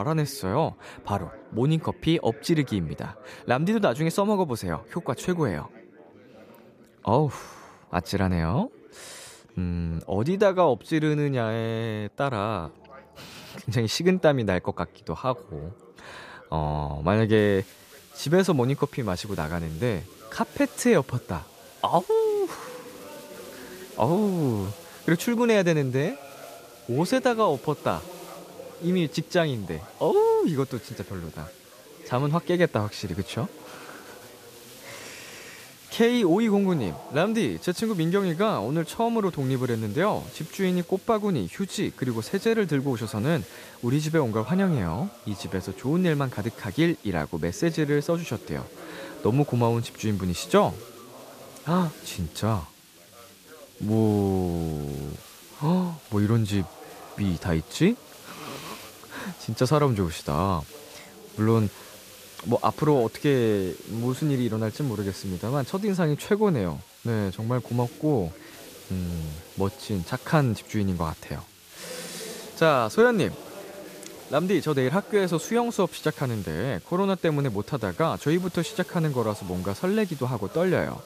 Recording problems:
background chatter; faint; throughout; 4 voices, 20 dB below the speech
hiss; faint; from 17 s on; 20 dB below the speech
abrupt cut into speech; at the start

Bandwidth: 14.5 kHz